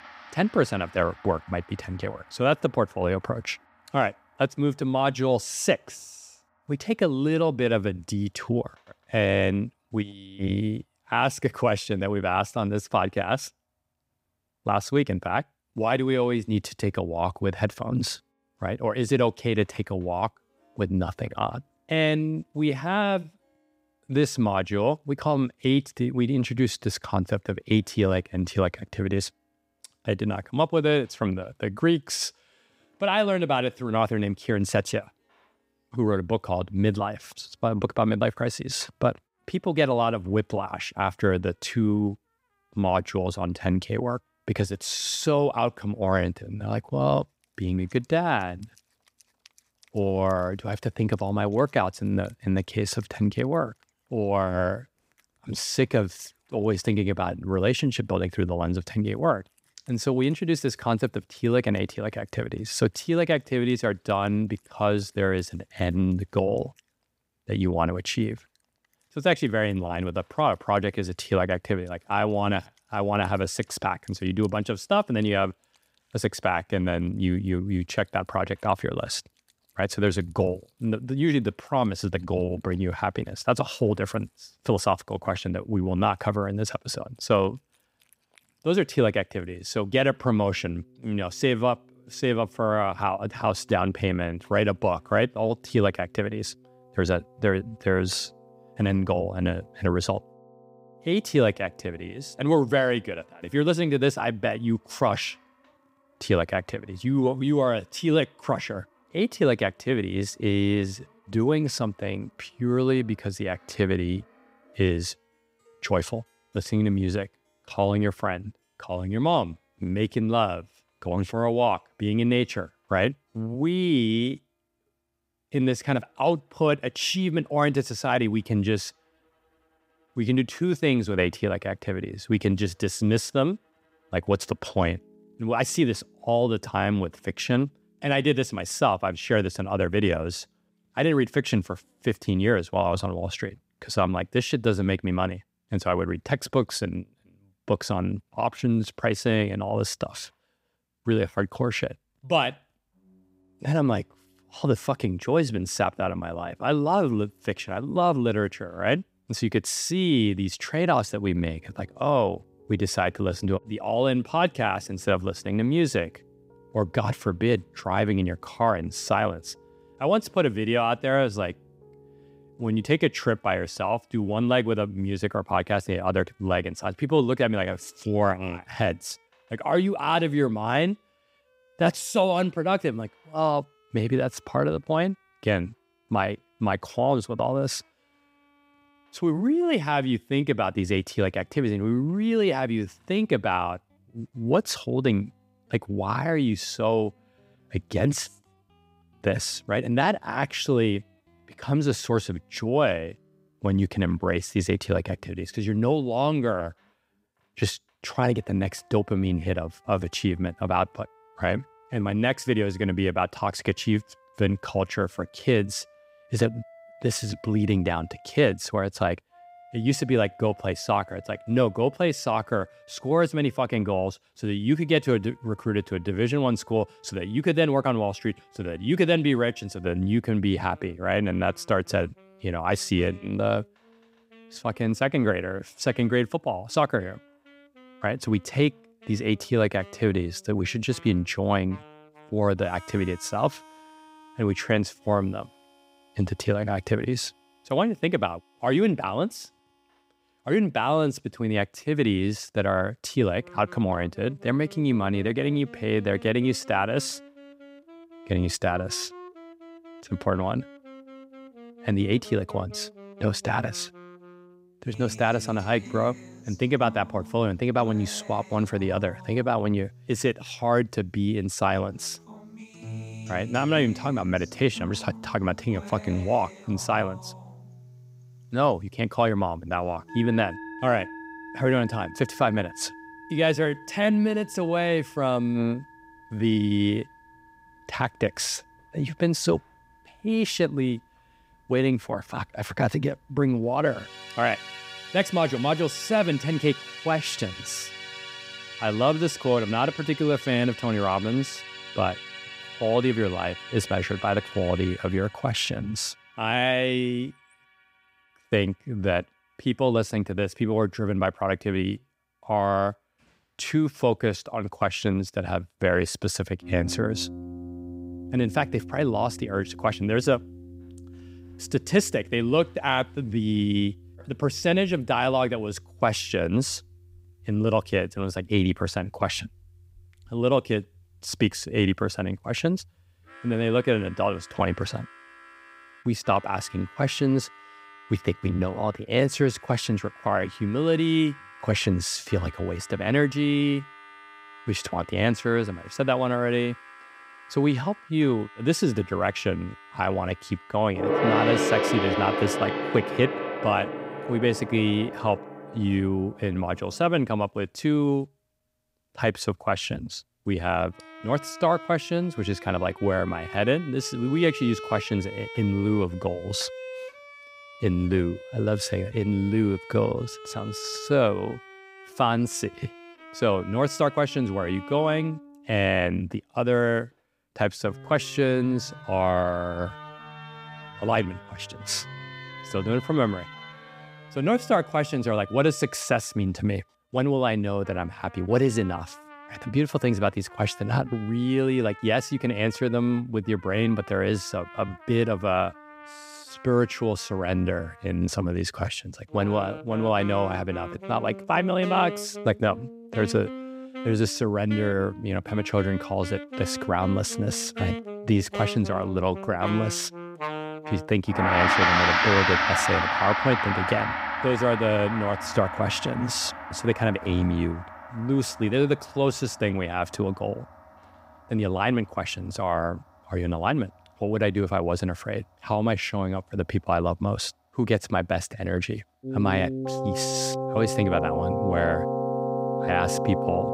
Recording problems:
background music; loud; throughout; 9 dB below the speech

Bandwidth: 15.5 kHz